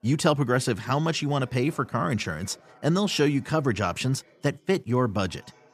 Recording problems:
background chatter; faint; throughout; 4 voices, 30 dB below the speech

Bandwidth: 14.5 kHz